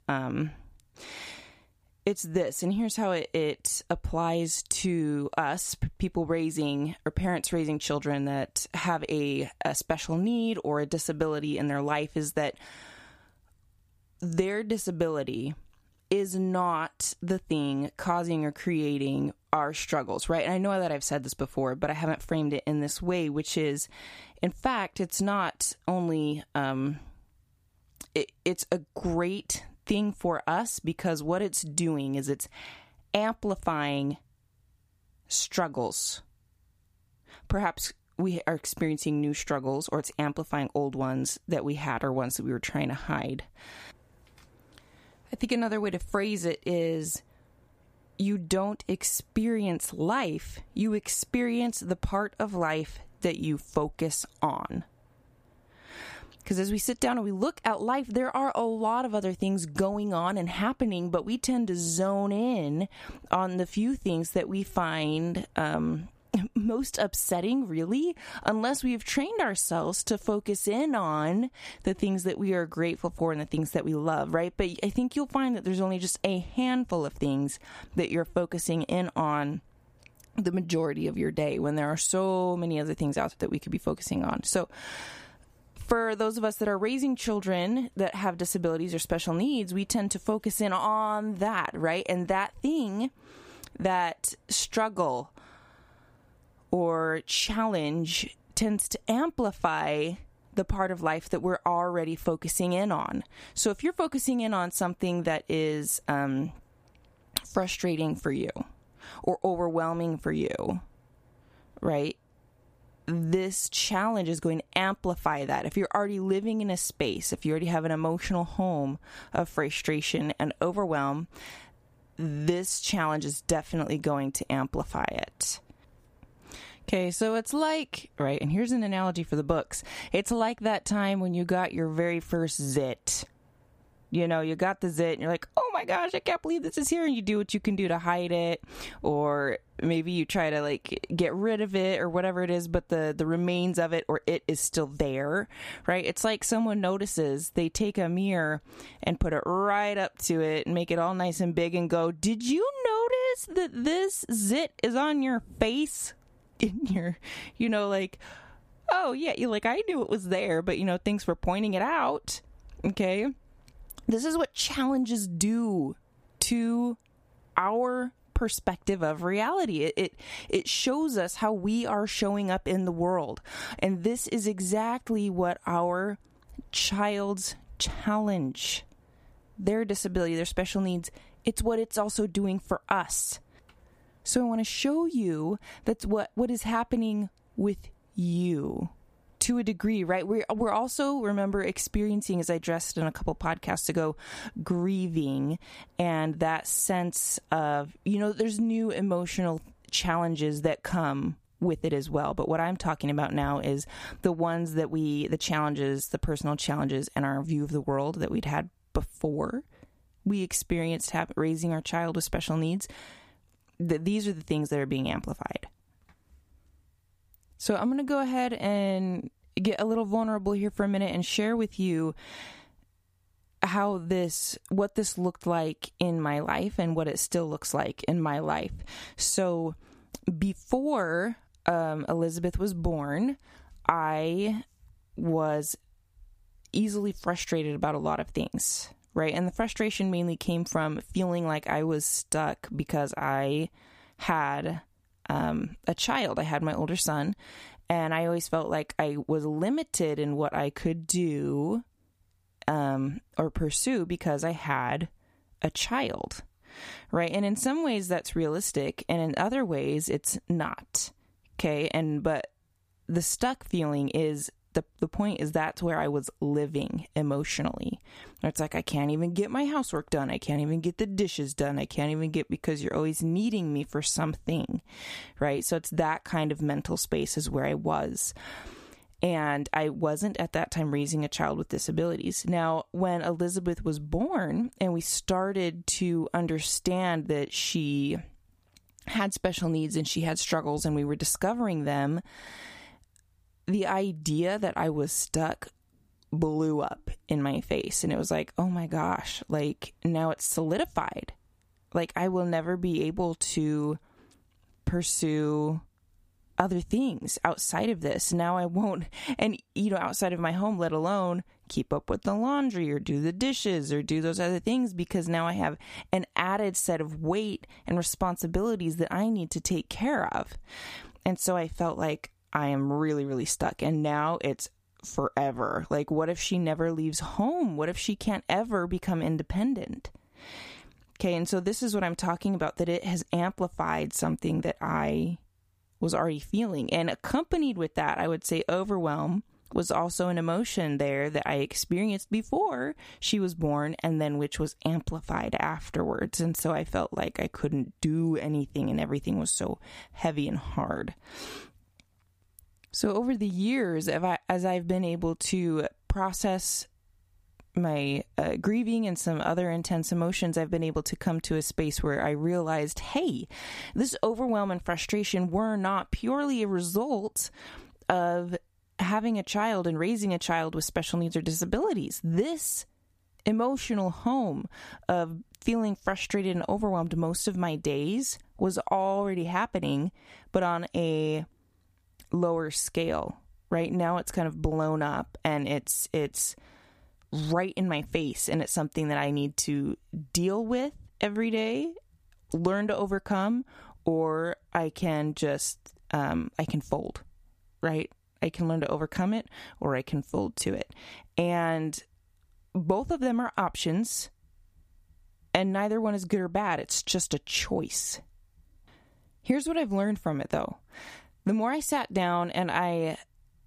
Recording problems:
squashed, flat; somewhat

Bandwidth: 15 kHz